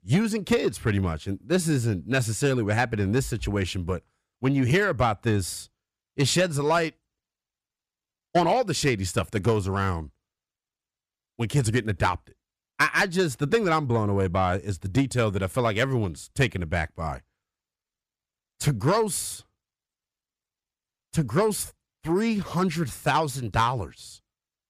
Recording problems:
distortion; slight; 10 dB below the speech

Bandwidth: 14.5 kHz